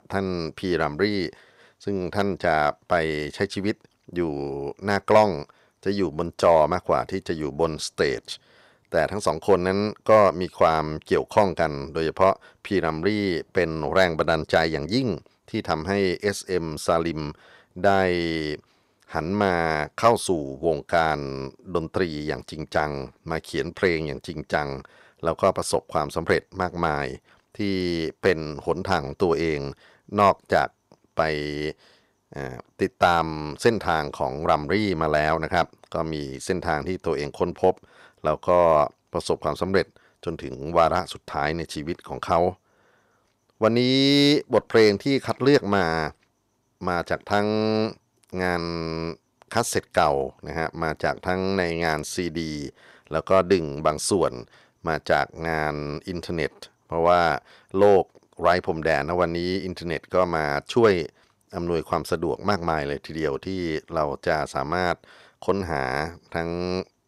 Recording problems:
none

